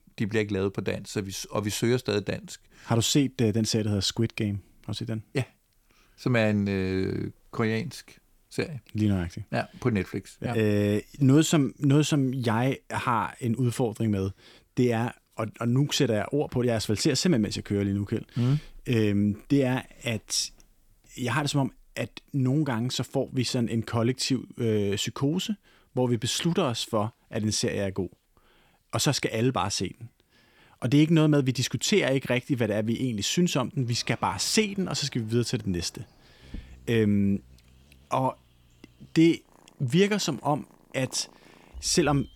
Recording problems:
animal sounds; faint; from 34 s on; 25 dB below the speech

